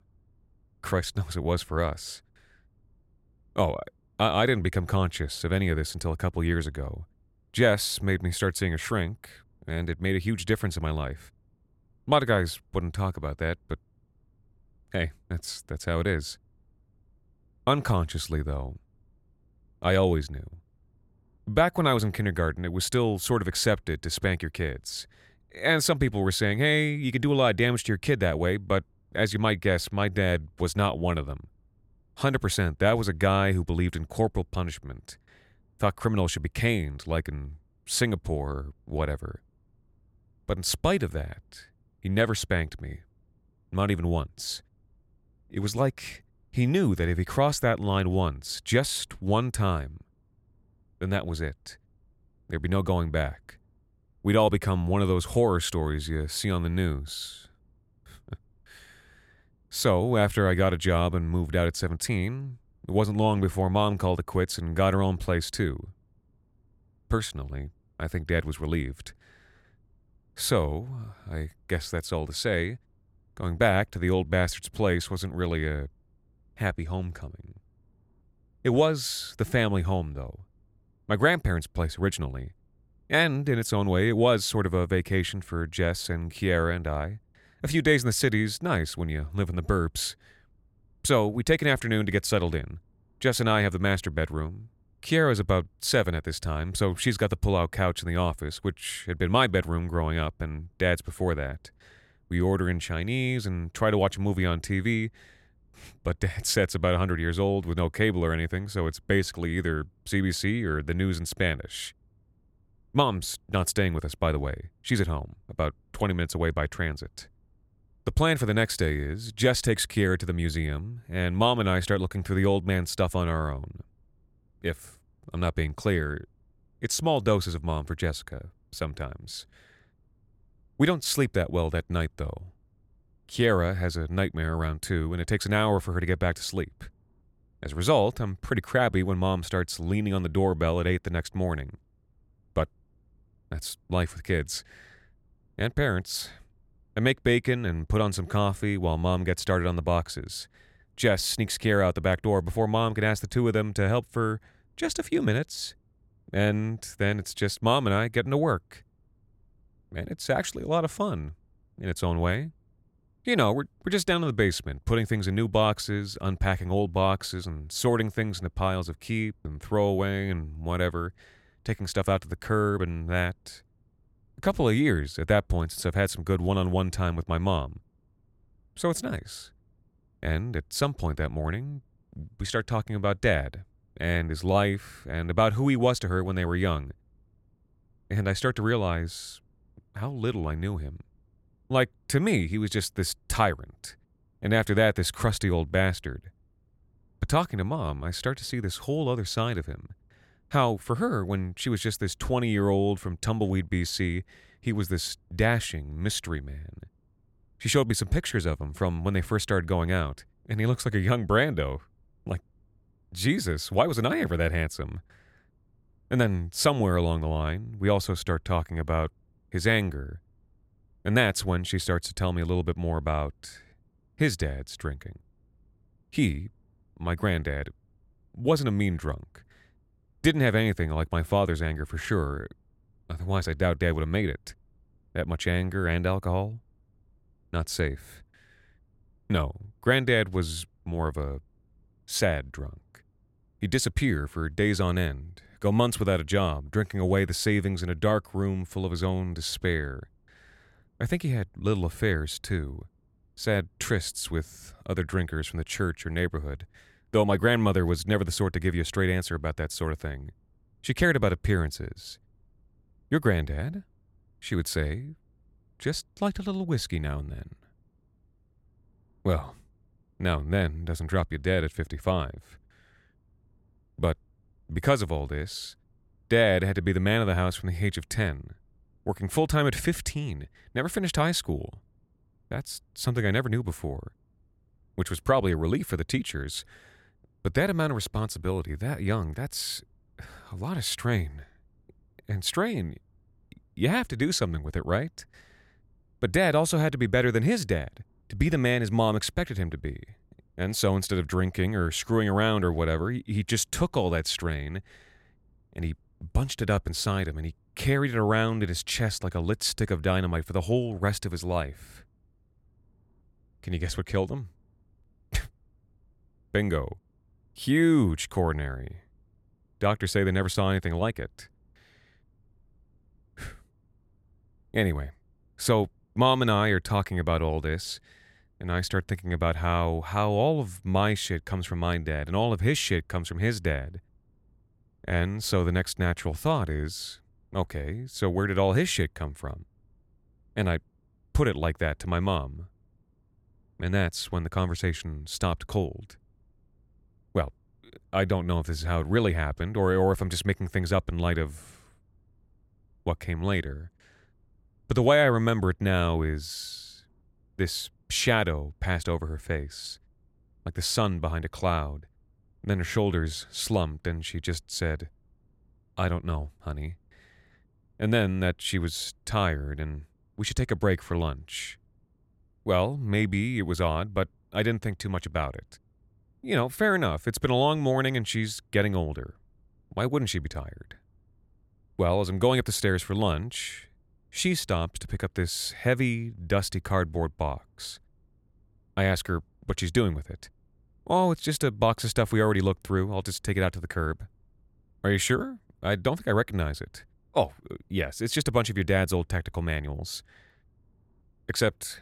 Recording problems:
none

